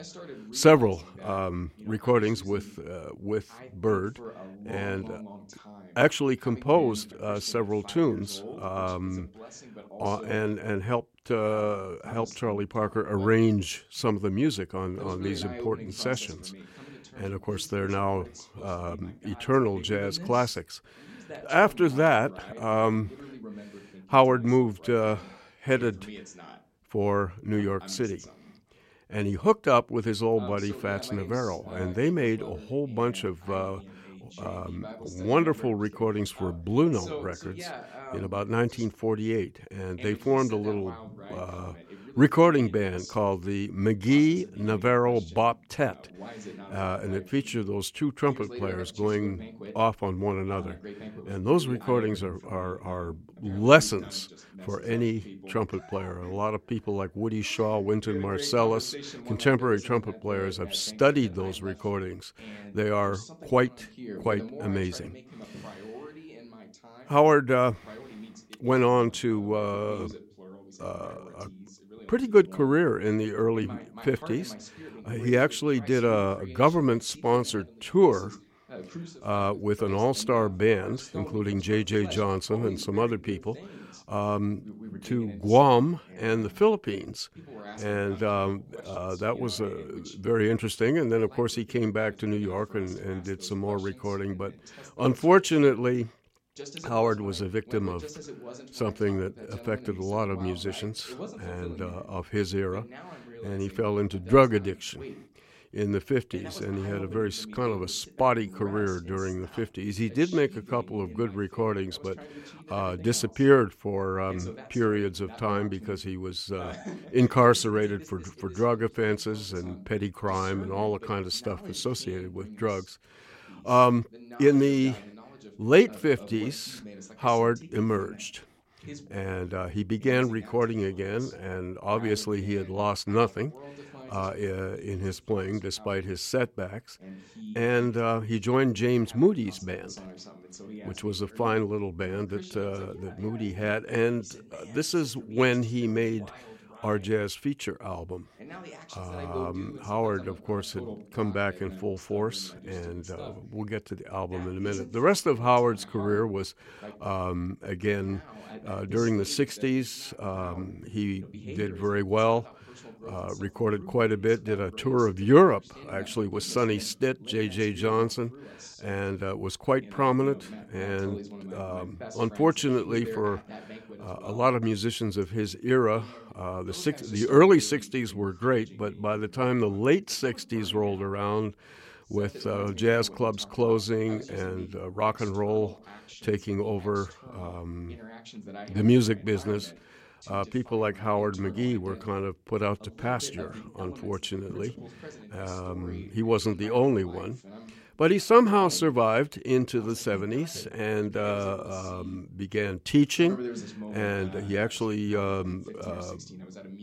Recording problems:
voice in the background; noticeable; throughout; 20 dB below the speech

